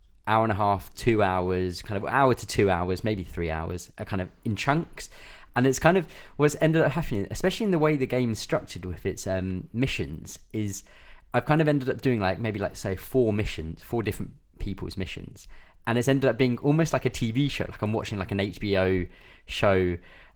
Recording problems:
garbled, watery; slightly; nothing above 19 kHz

